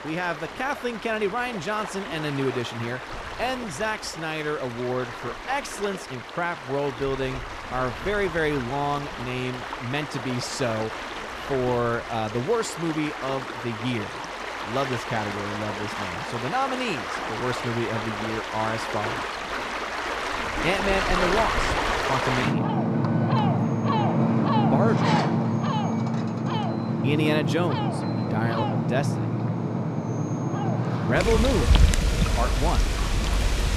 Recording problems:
rain or running water; very loud; throughout; 1 dB above the speech

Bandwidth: 14 kHz